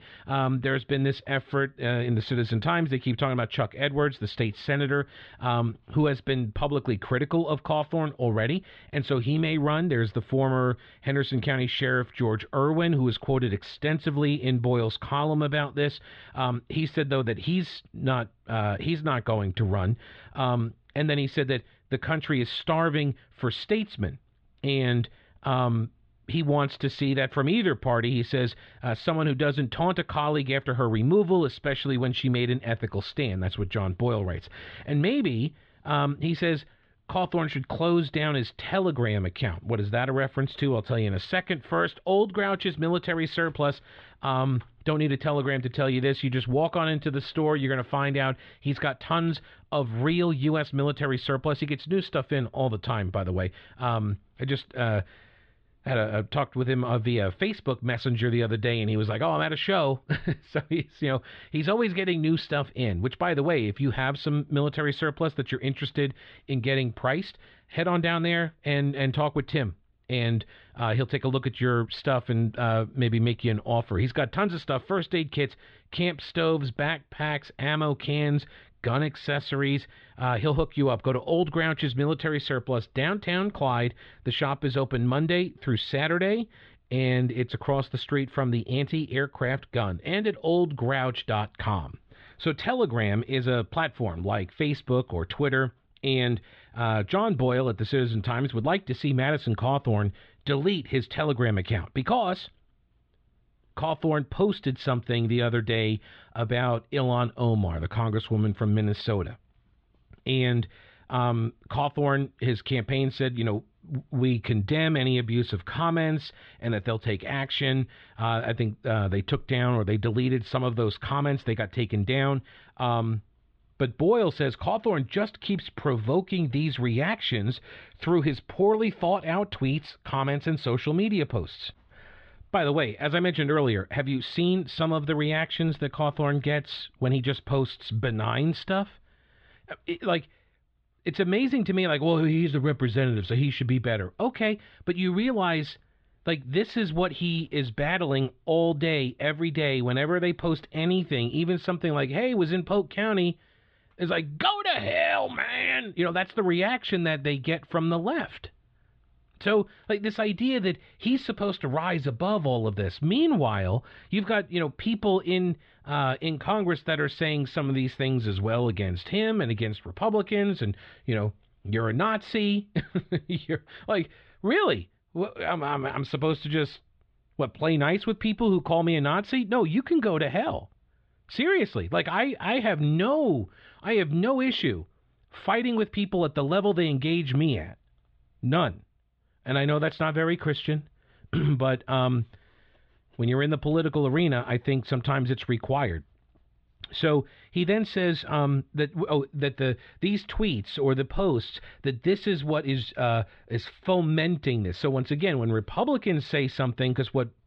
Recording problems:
muffled; slightly; fading above 3.5 kHz

